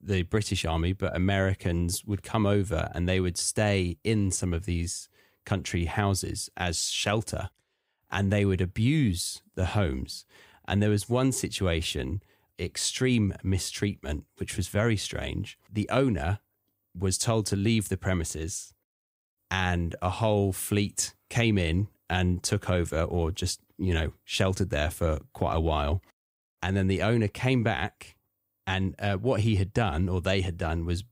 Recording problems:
none

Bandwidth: 15.5 kHz